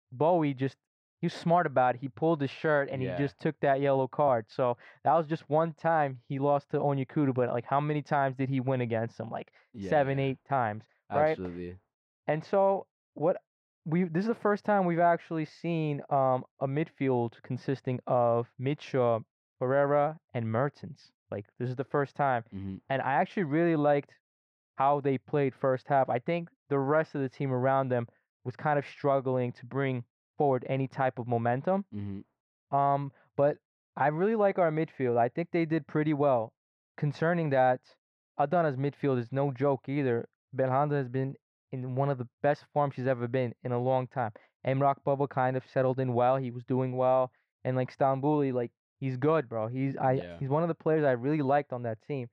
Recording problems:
muffled; very; fading above 2 kHz

